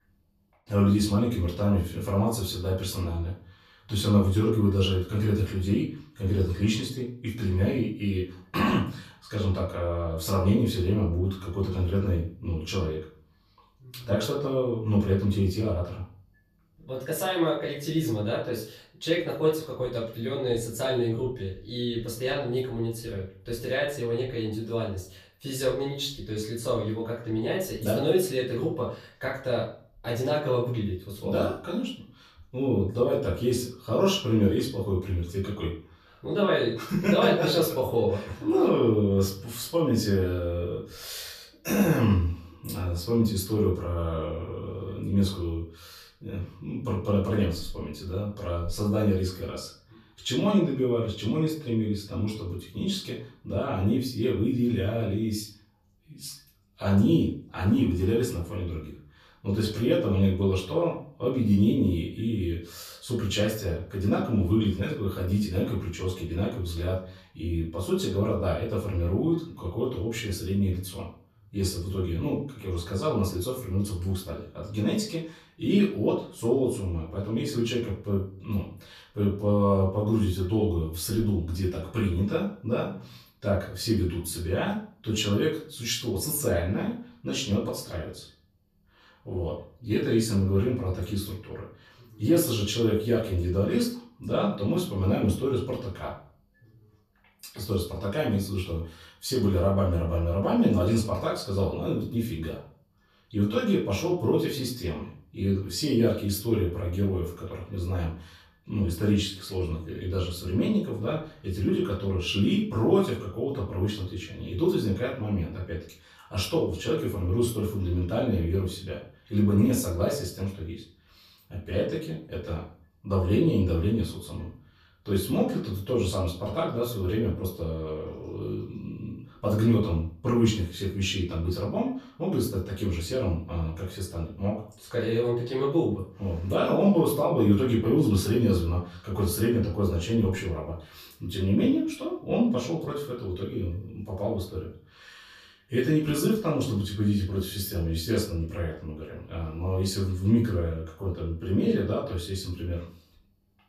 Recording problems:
off-mic speech; far
room echo; slight; dies away in 0.4 s

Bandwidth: 14.5 kHz